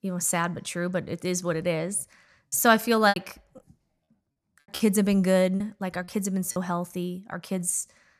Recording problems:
choppy; very; from 3 to 6.5 s; 9% of the speech affected

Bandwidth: 14.5 kHz